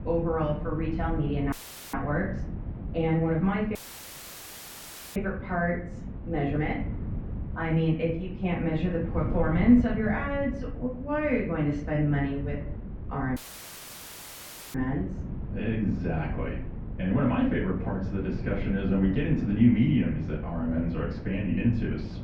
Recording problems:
off-mic speech; far
muffled; very; fading above 2.5 kHz
room echo; slight; dies away in 0.6 s
wind noise on the microphone; occasional gusts; 15 dB below the speech
audio cutting out; filled with static; at 1.5 s, at 4 s for 1.5 s and at 13 s for 1.5 s

